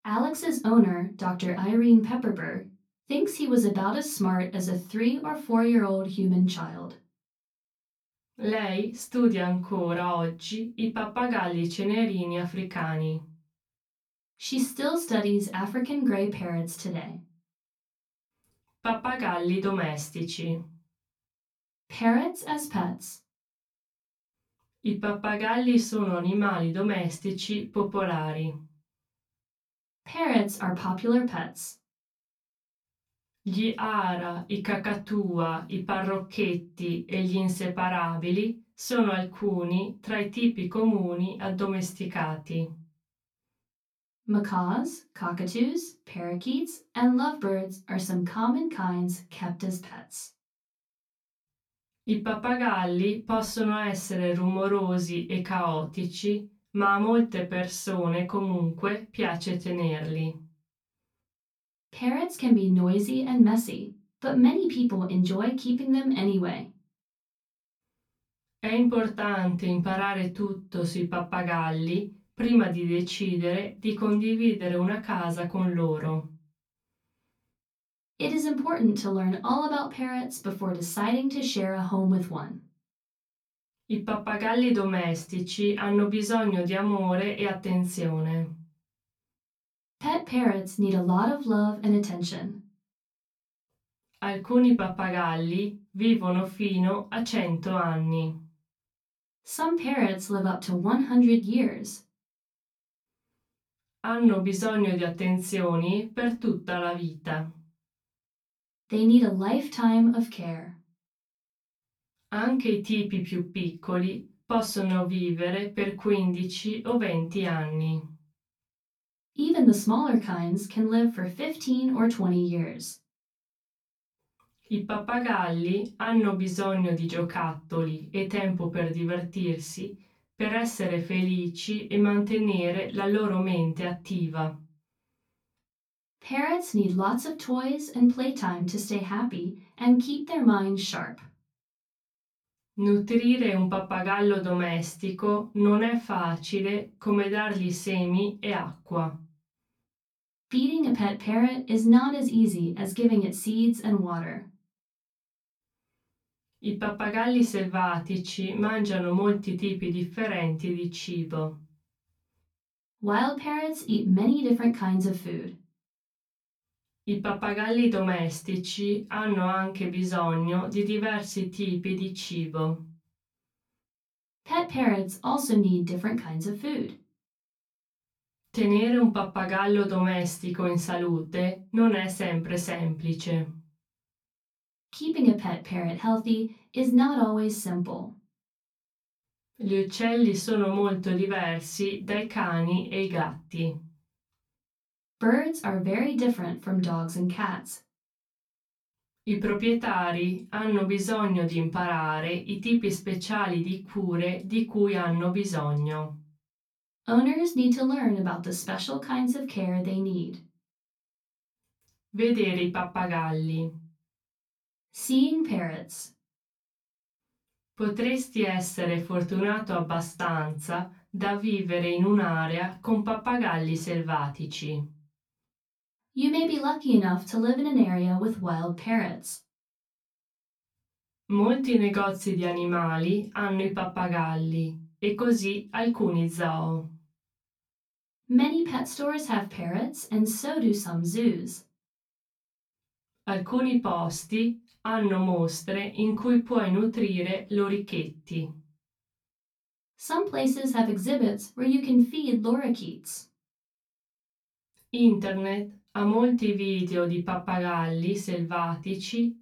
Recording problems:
off-mic speech; far
room echo; very slight; dies away in 0.2 s

